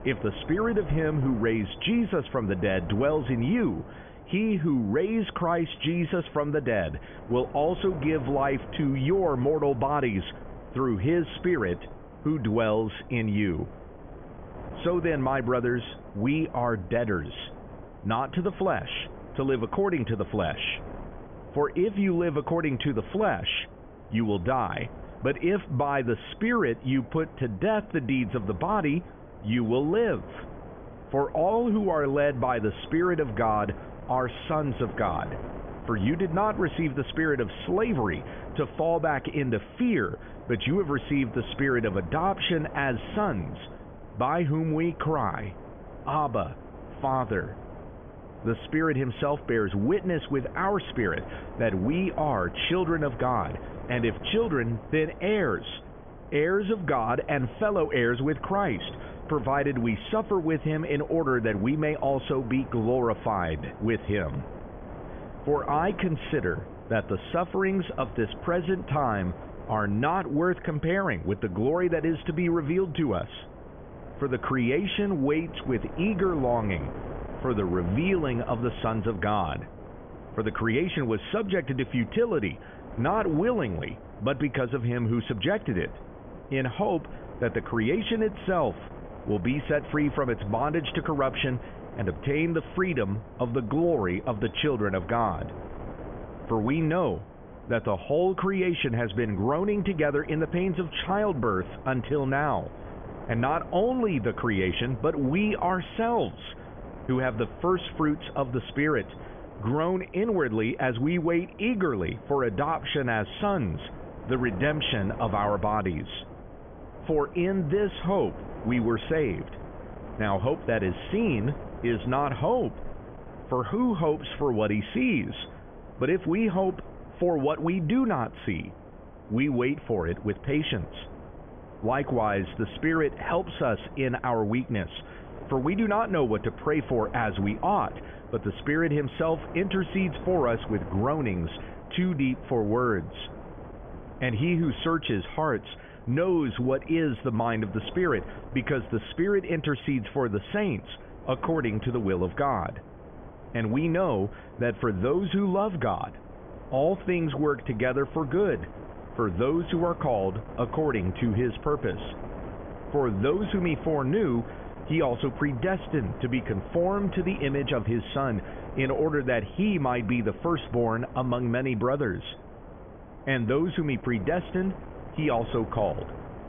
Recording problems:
high frequencies cut off; severe; nothing above 3.5 kHz
wind noise on the microphone; occasional gusts; 15 dB below the speech

